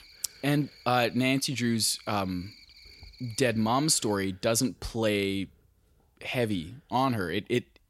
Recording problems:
animal sounds; faint; throughout; 25 dB below the speech

